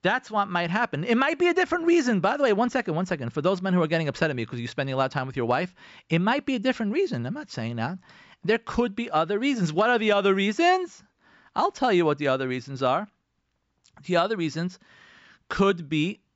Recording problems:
high frequencies cut off; noticeable; nothing above 8 kHz

